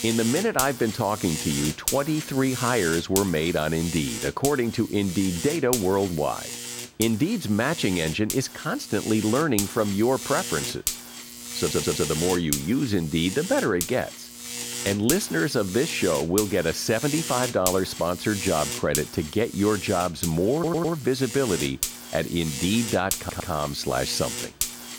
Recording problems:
electrical hum; loud; throughout; 50 Hz, 6 dB below the speech
audio stuttering; at 12 s, at 21 s and at 23 s

